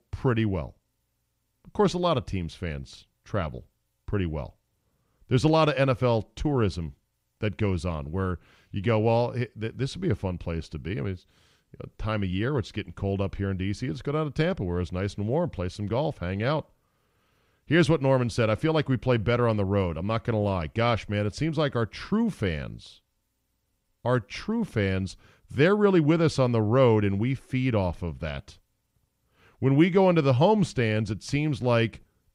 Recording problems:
none

